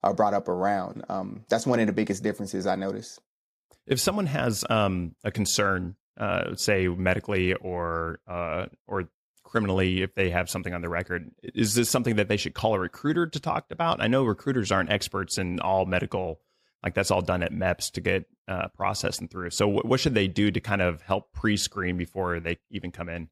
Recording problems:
none

